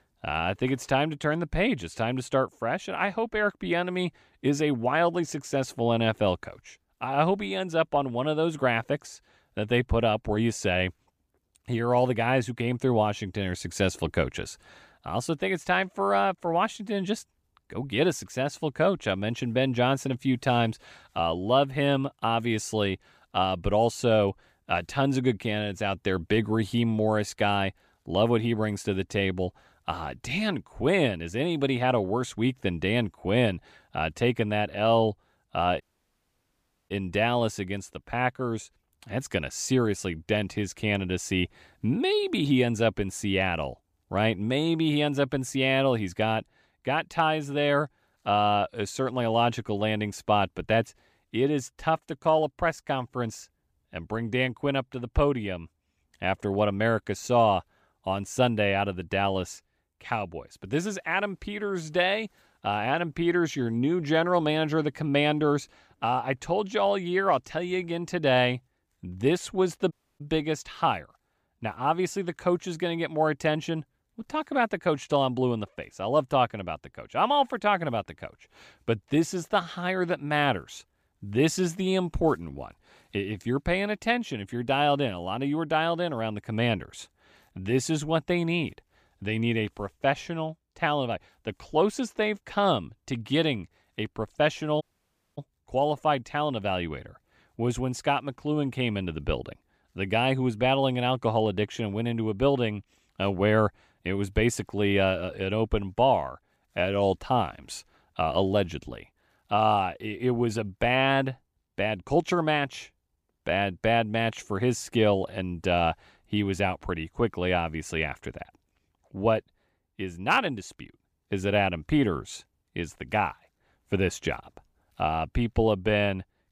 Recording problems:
audio cutting out; at 36 s for 1 s, at 1:10 and at 1:35 for 0.5 s

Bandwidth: 15 kHz